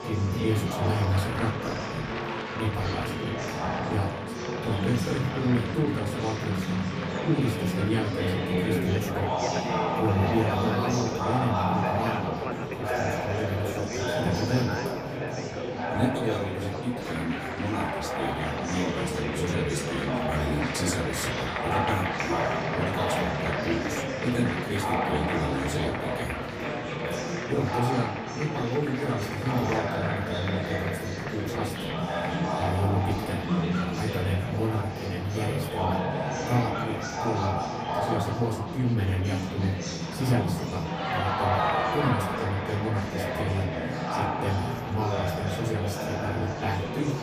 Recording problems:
off-mic speech; far
room echo; slight; dies away in 0.3 s
murmuring crowd; very loud; throughout; 1 dB above the speech
background music; noticeable; throughout; 15 dB below the speech

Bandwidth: 15 kHz